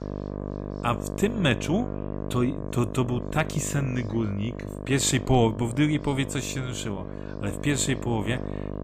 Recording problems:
electrical hum; loud; throughout; 50 Hz, 9 dB below the speech
background chatter; faint; throughout; 4 voices, 30 dB below the speech

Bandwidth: 15 kHz